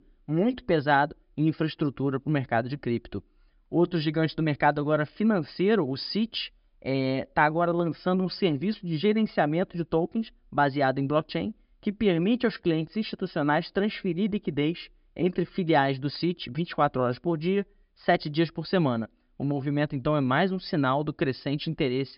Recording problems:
high frequencies cut off; noticeable; nothing above 5.5 kHz

